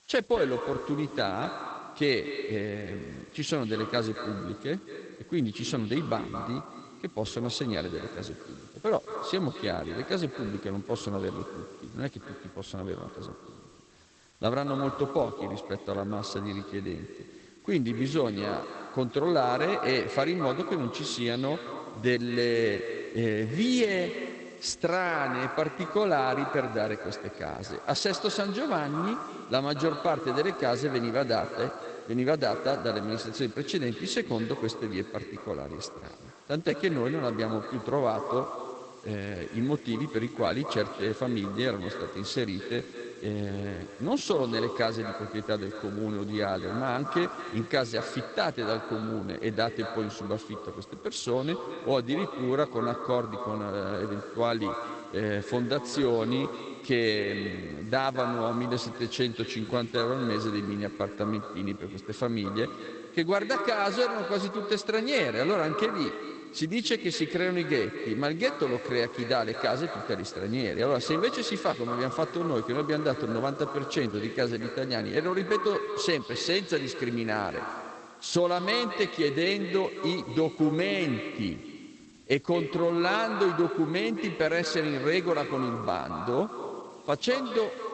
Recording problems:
echo of what is said; strong; throughout; 220 ms later, 8 dB below the speech
garbled, watery; badly; nothing above 8 kHz
hiss; faint; throughout; 25 dB below the speech

